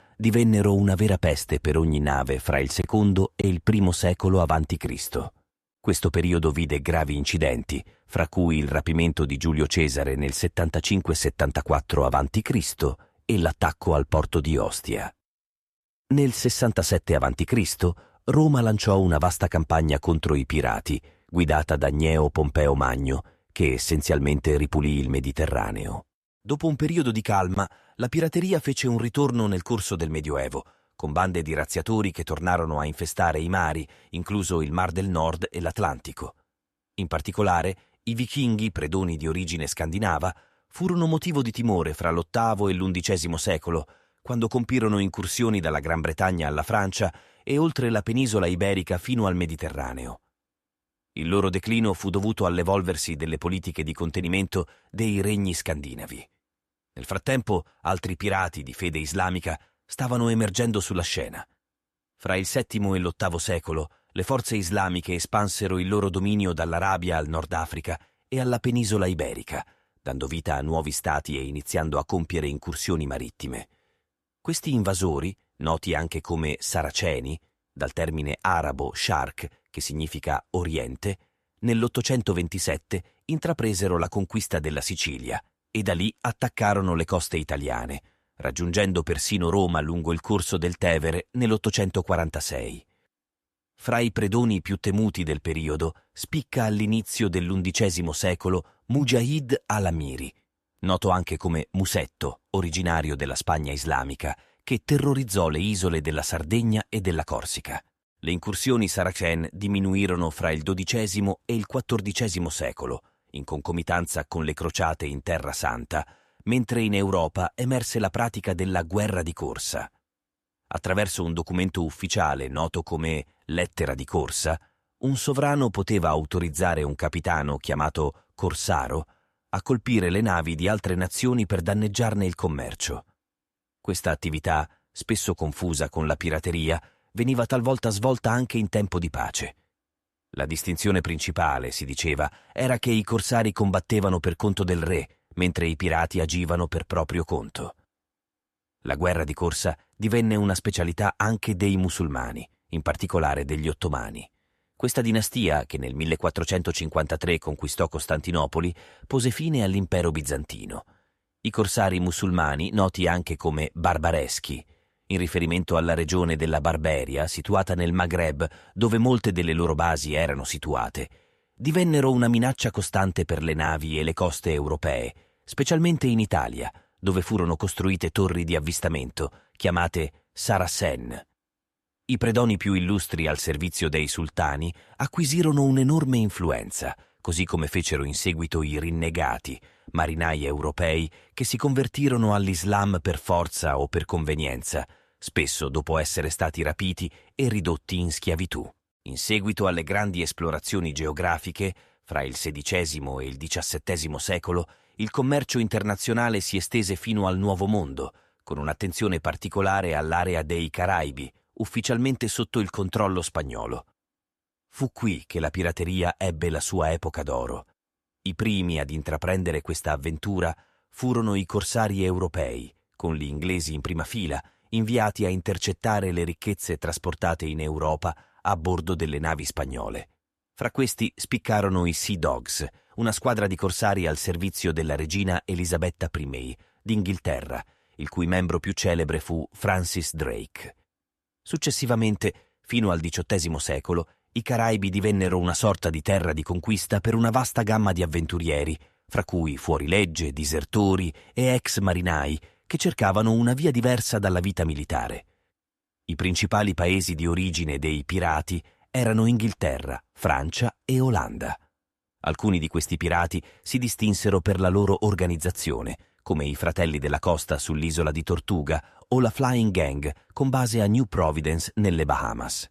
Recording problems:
none

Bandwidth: 13.5 kHz